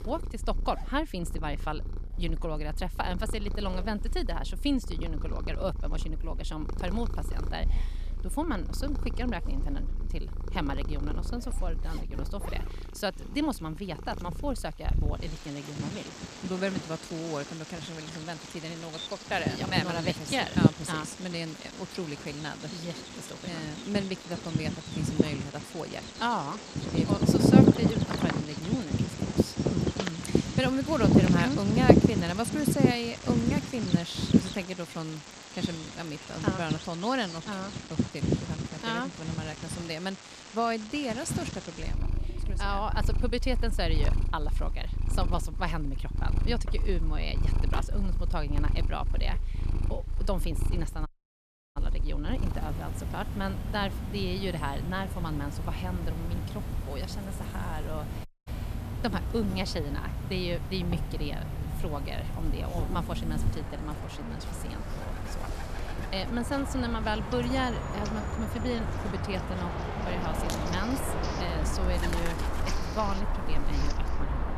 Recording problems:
animal sounds; very loud; throughout; 3 dB above the speech
household noises; noticeable; throughout; 20 dB below the speech
audio cutting out; at 51 s for 0.5 s and at 58 s

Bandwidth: 14 kHz